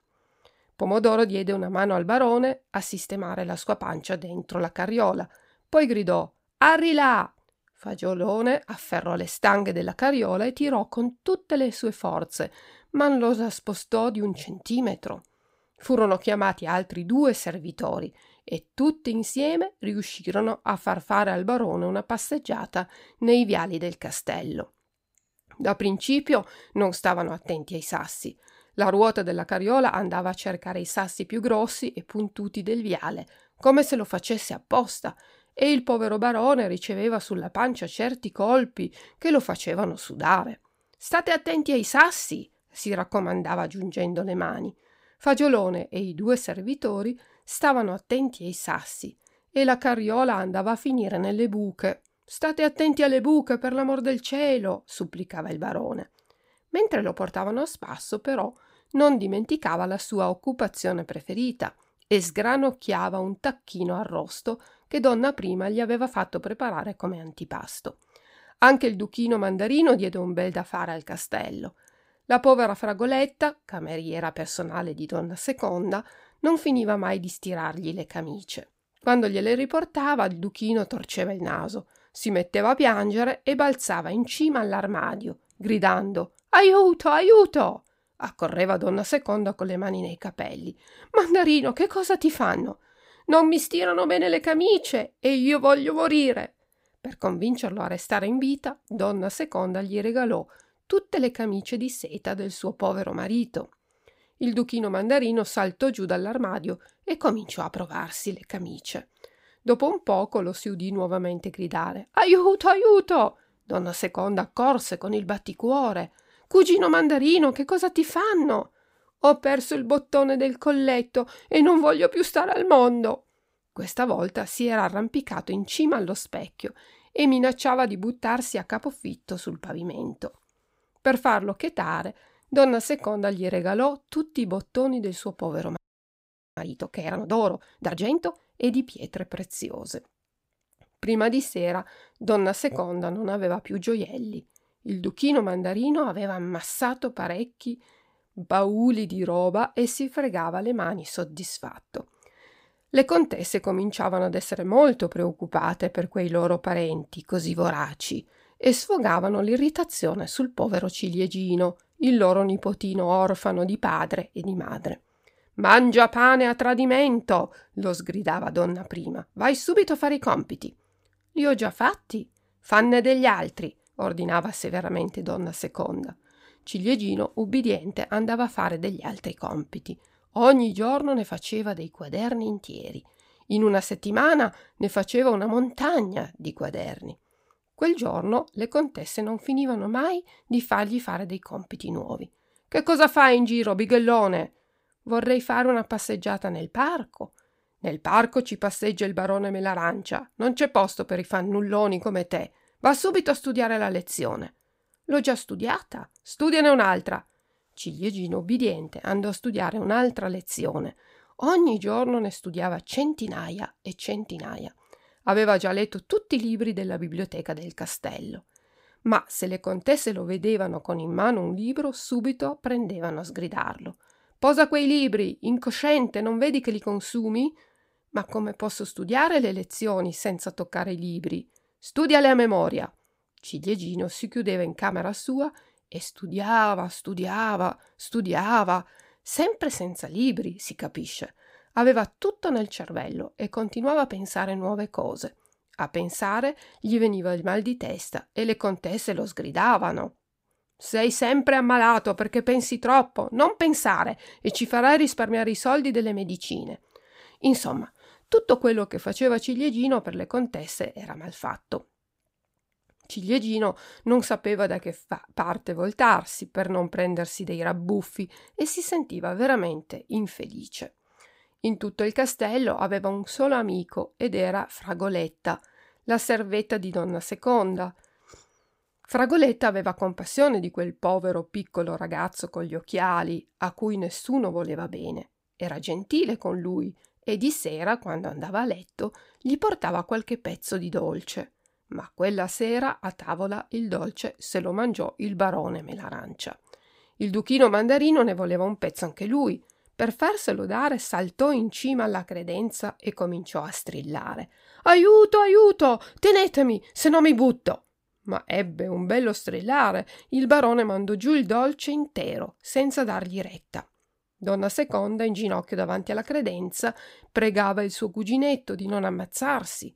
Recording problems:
audio freezing; at 2:16 for 1 s

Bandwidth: 15.5 kHz